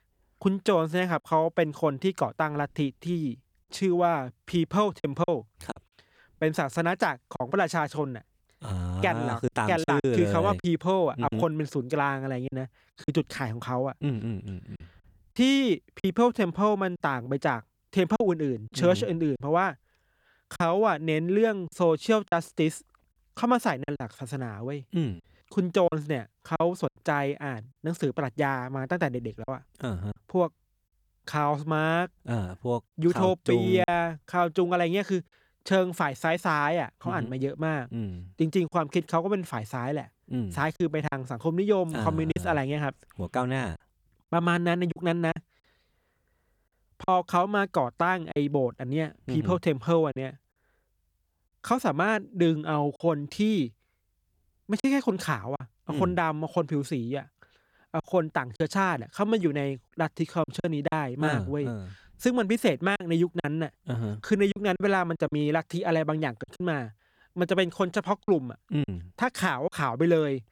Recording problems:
choppy; occasionally; 4% of the speech affected

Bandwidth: 18.5 kHz